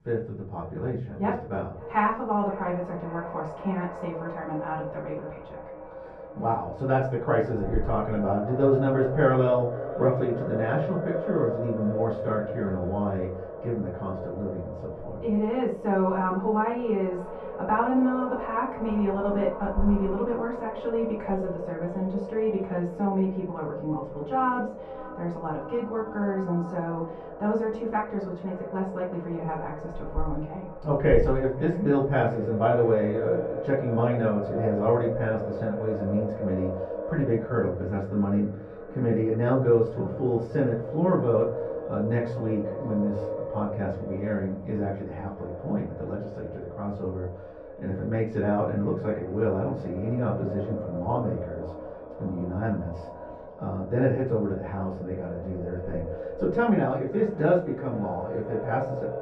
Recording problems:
echo of what is said; strong; throughout; 530 ms later, 9 dB below the speech
off-mic speech; far
muffled; very; fading above 3 kHz
room echo; slight; dies away in 0.4 s

